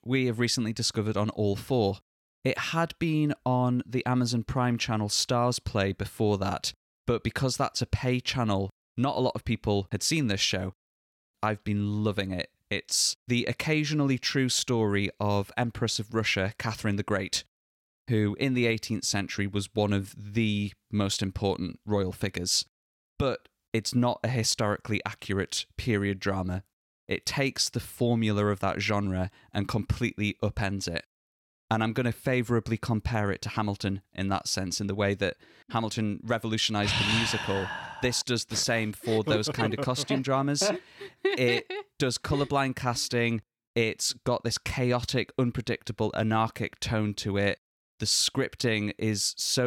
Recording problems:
abrupt cut into speech; at the end

